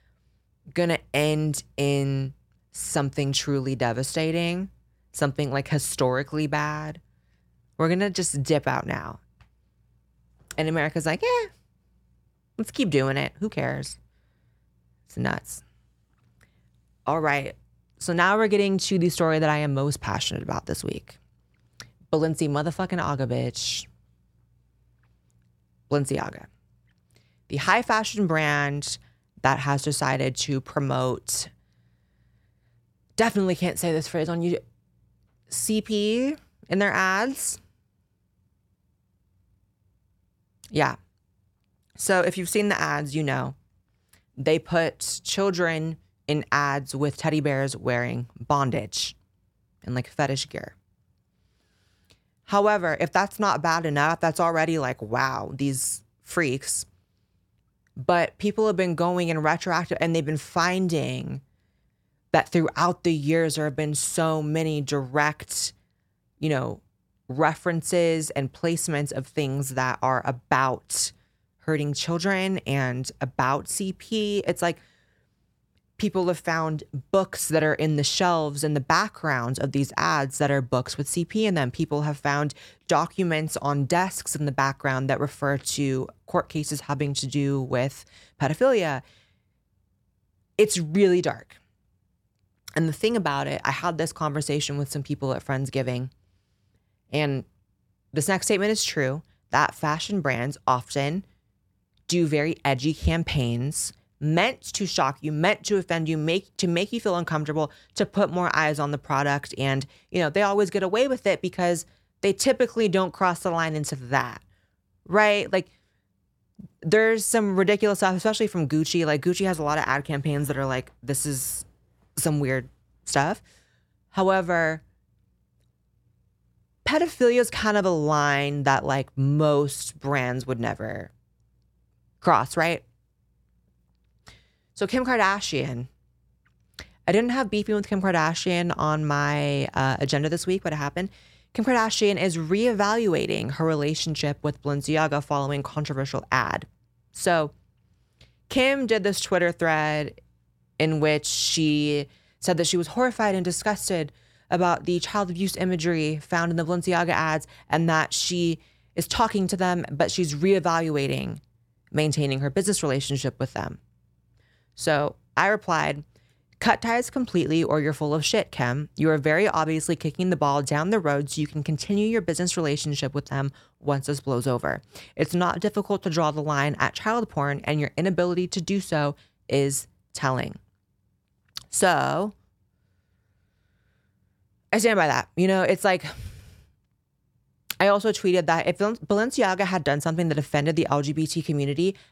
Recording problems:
none

